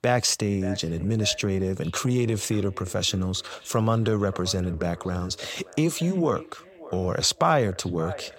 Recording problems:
echo of what is said; faint; throughout; 580 ms later, 20 dB below the speech

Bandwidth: 16 kHz